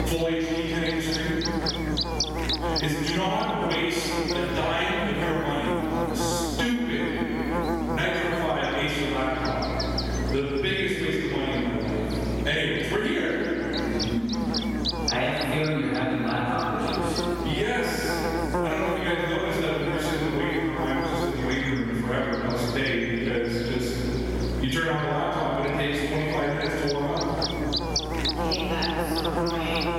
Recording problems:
room echo; strong; dies away in 2 s
off-mic speech; far
squashed, flat; somewhat
electrical hum; loud; throughout; 60 Hz, 4 dB below the speech

